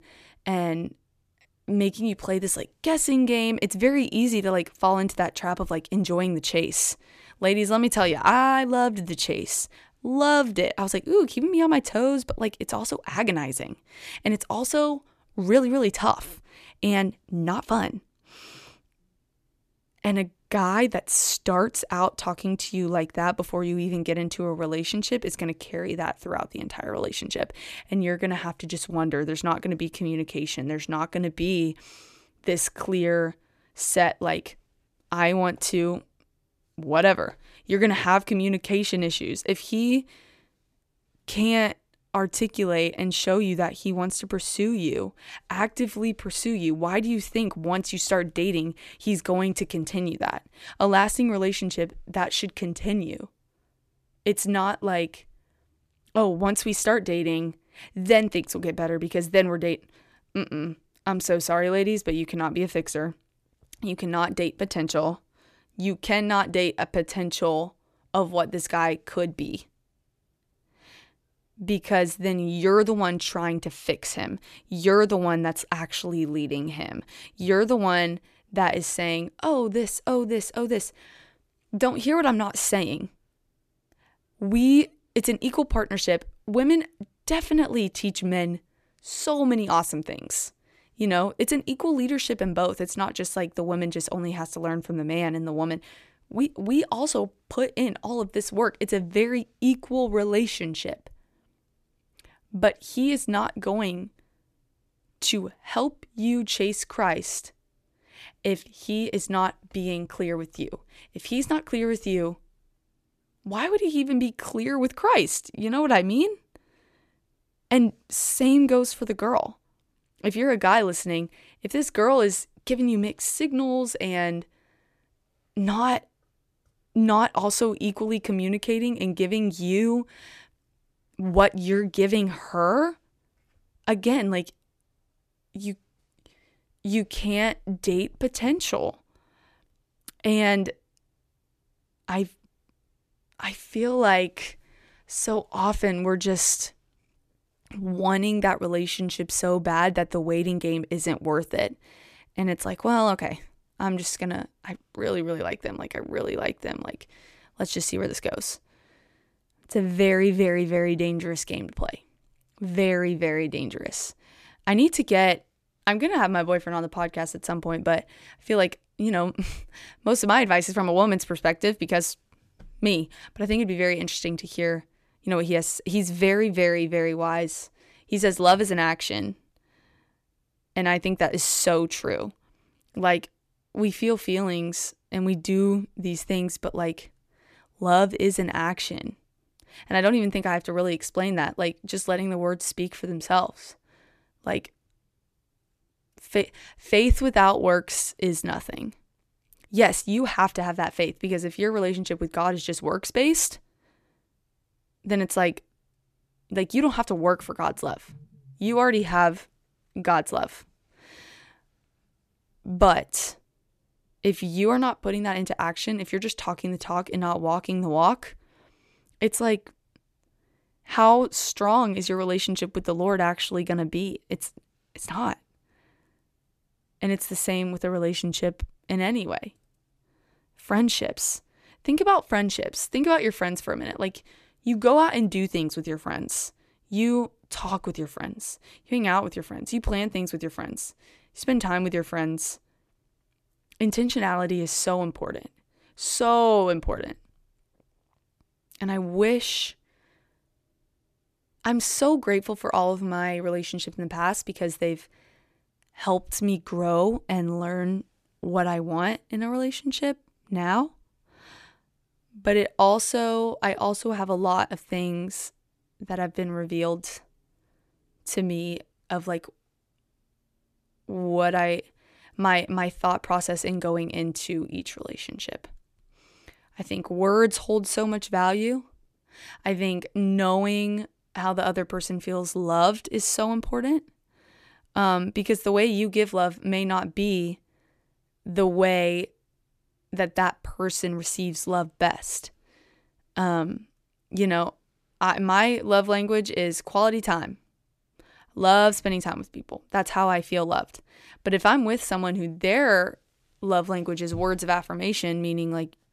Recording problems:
none

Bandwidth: 14.5 kHz